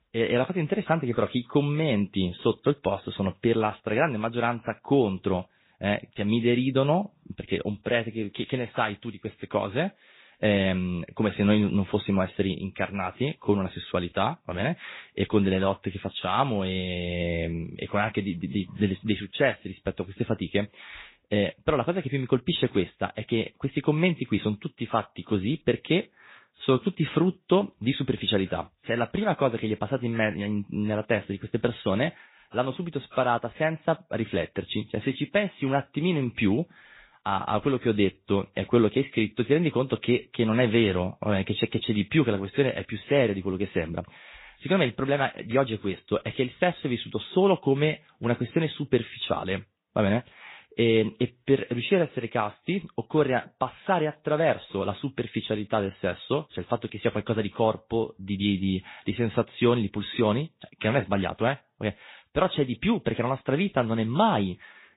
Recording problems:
high frequencies cut off; severe; nothing above 4 kHz
garbled, watery; slightly

